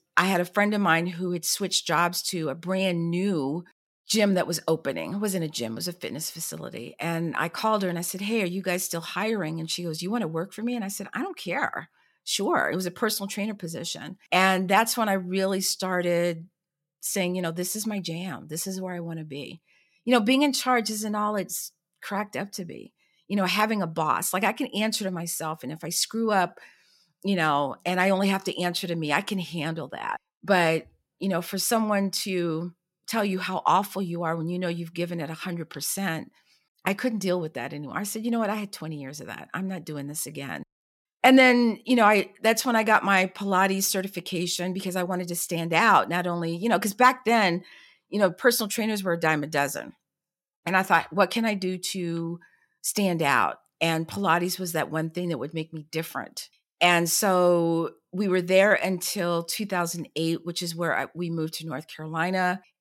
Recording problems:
none

